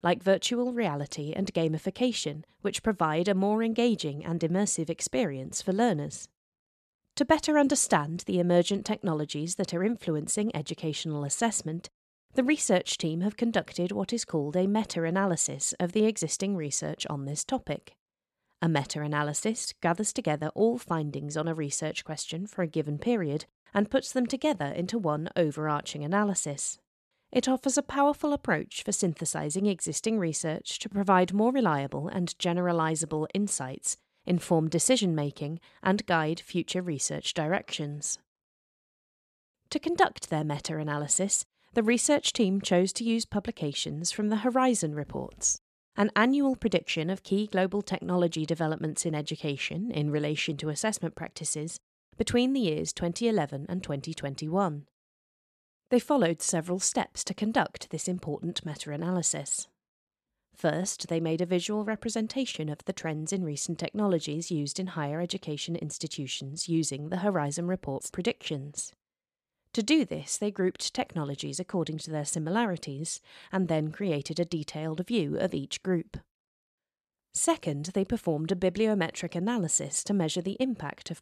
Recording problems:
none

